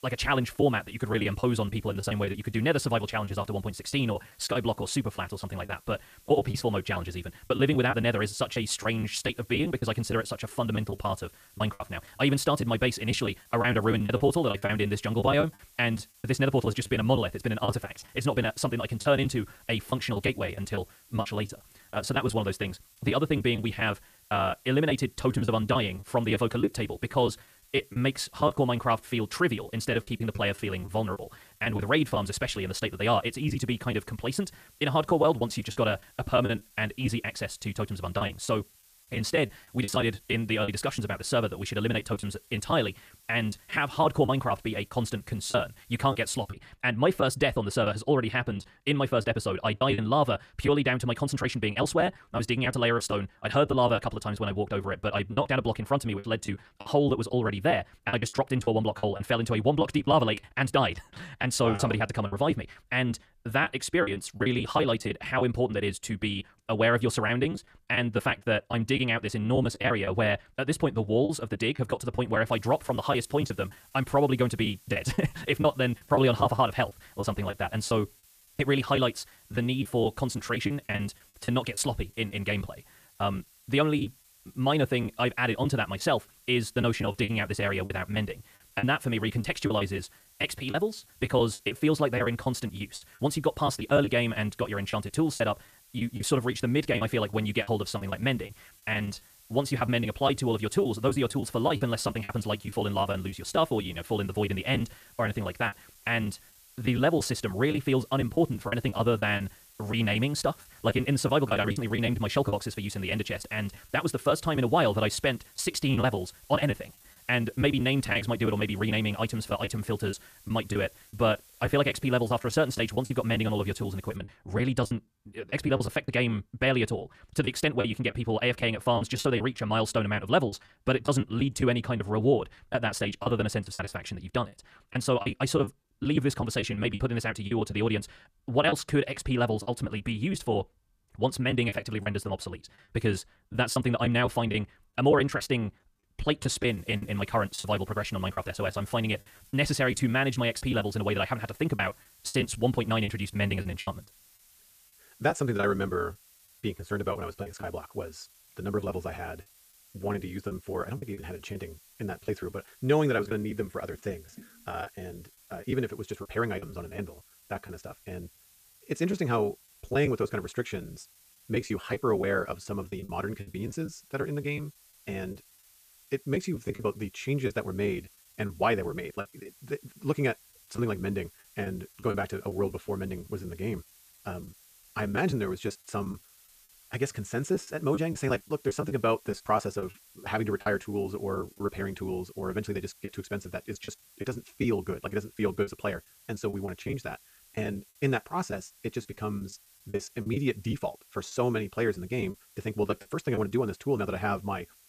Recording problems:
wrong speed, natural pitch; too fast; 1.5 times normal speed
hiss; faint; until 47 s, from 1:13 to 2:04 and from 2:27 on; 25 dB below the speech
choppy; very; 9% of the speech affected

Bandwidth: 14.5 kHz